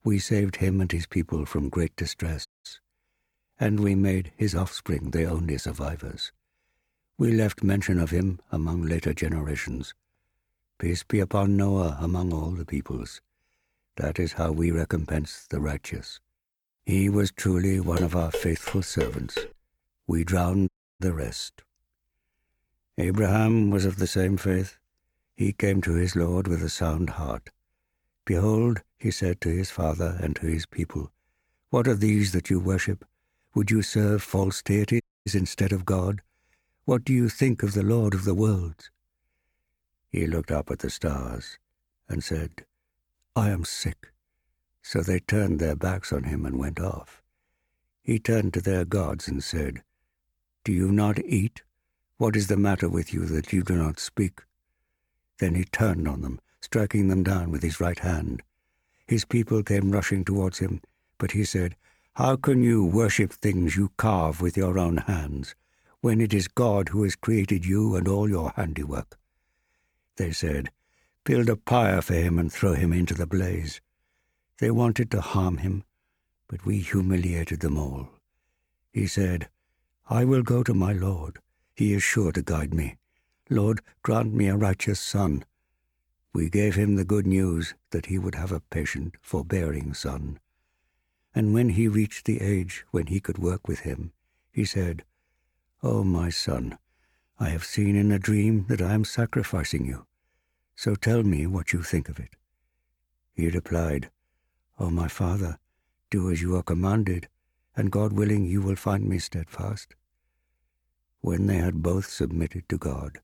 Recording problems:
audio cutting out; at 2.5 s, at 21 s and at 35 s
clattering dishes; noticeable; from 18 to 19 s; peak 6 dB below the speech

